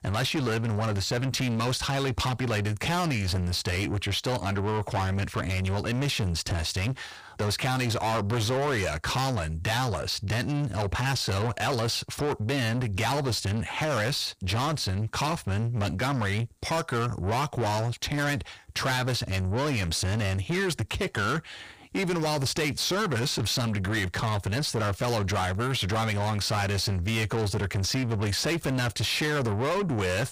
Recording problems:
distortion; heavy; 7 dB below the speech

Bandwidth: 15 kHz